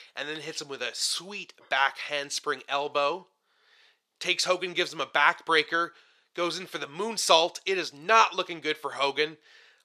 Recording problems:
thin; very; fading below 500 Hz

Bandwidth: 14.5 kHz